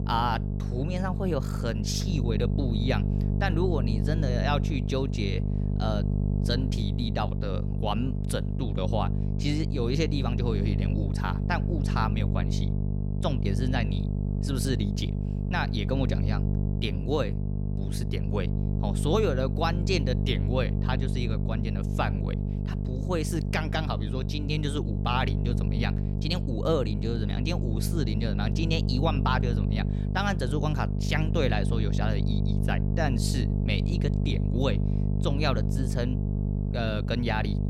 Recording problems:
electrical hum; loud; throughout; 50 Hz, 7 dB below the speech

